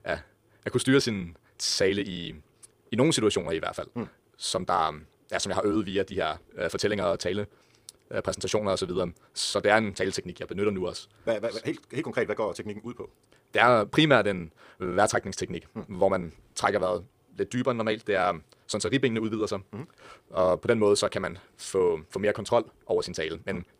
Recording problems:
wrong speed, natural pitch; too fast; 1.5 times normal speed

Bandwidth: 15 kHz